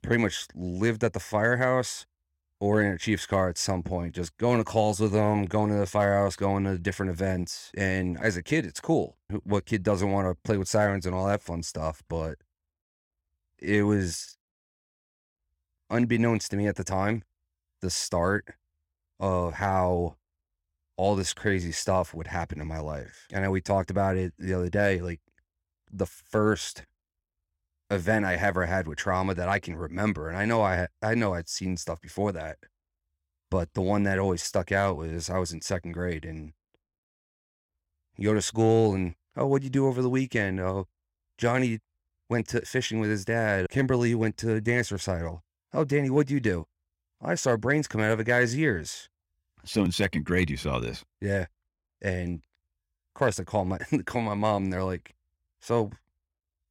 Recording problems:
none

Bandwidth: 16.5 kHz